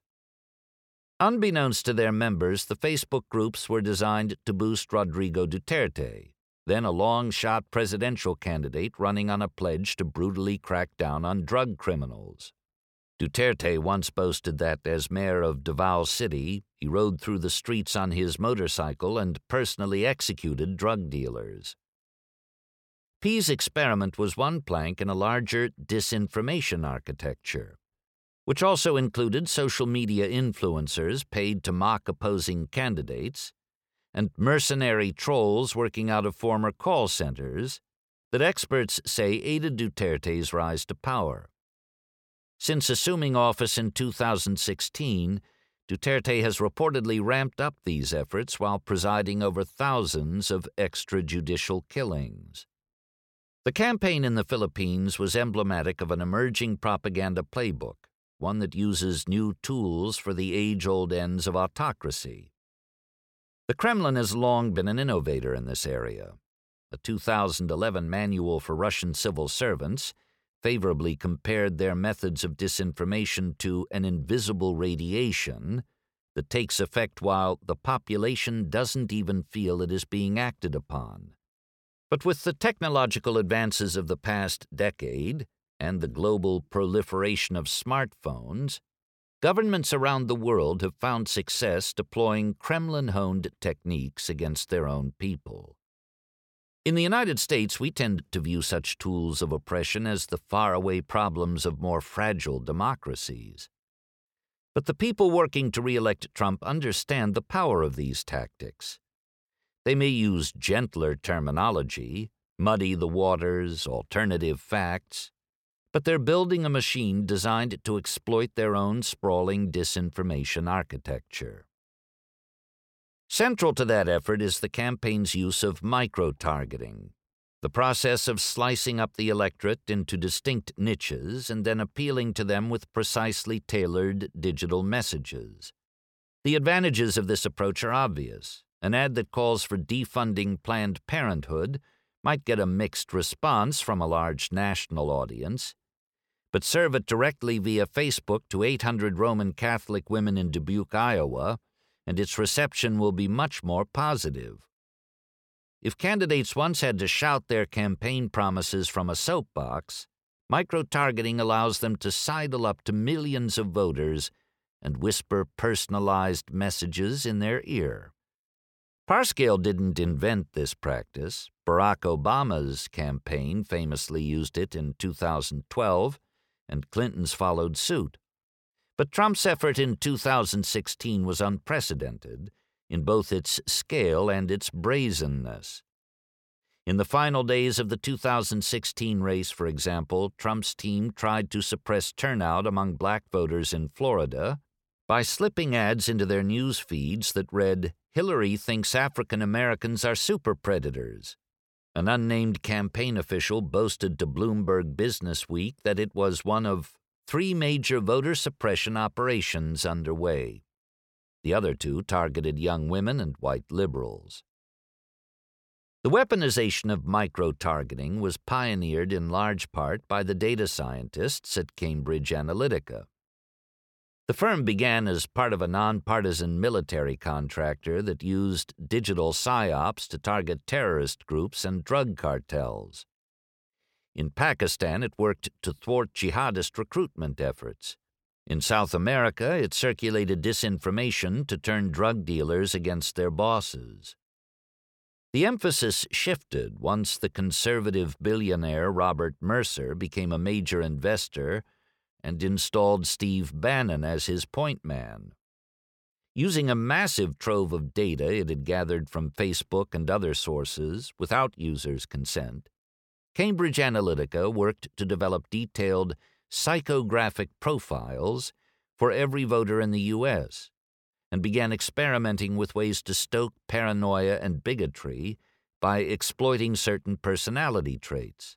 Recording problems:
none

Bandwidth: 17 kHz